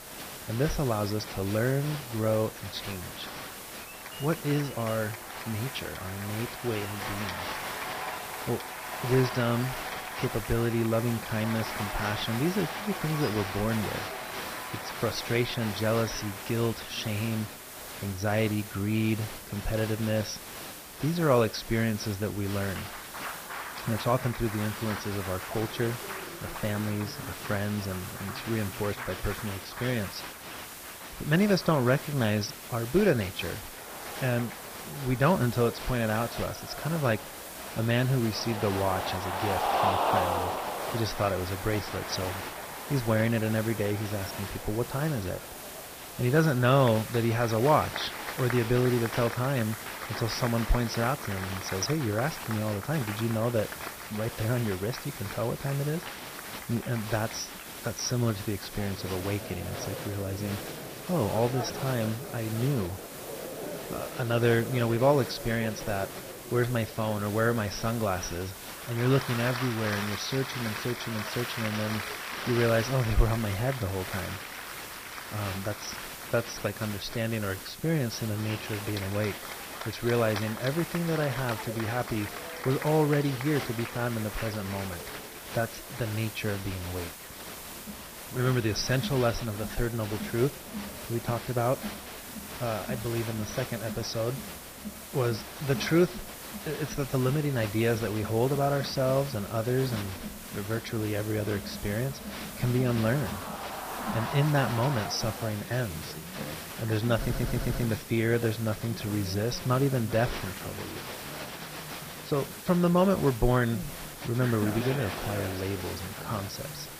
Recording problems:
garbled, watery; badly; nothing above 6 kHz
crowd noise; loud; throughout; 9 dB below the speech
hiss; noticeable; throughout; 10 dB below the speech
audio stuttering; at 1:47

